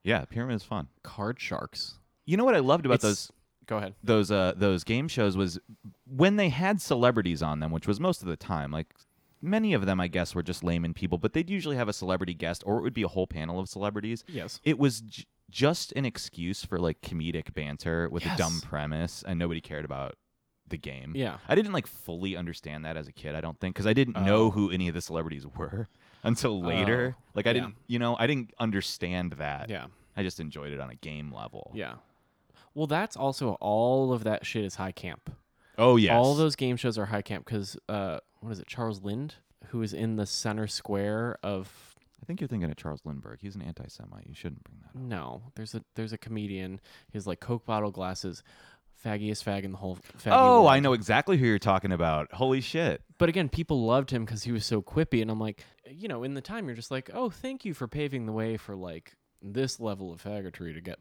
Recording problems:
none

